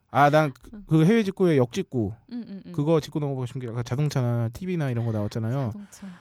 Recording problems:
none

